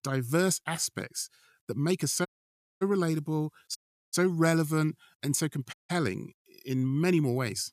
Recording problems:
audio cutting out; at 2.5 s for 0.5 s, at 4 s and at 5.5 s

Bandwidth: 14.5 kHz